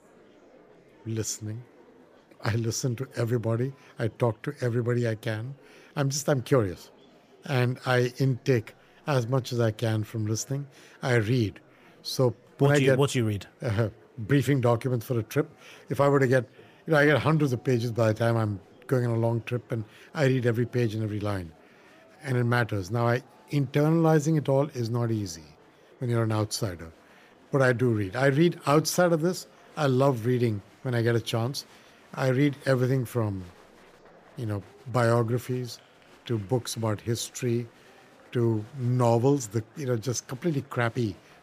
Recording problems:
murmuring crowd; faint; throughout; 30 dB below the speech

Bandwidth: 15 kHz